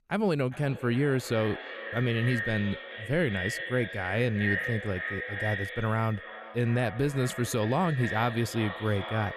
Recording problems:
echo of what is said; strong; throughout; 400 ms later, 6 dB below the speech

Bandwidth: 13.5 kHz